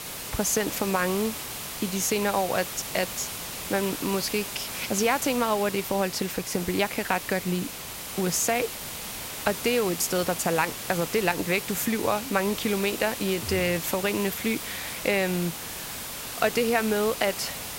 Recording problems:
hiss; loud; throughout; 6 dB below the speech

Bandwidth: 16 kHz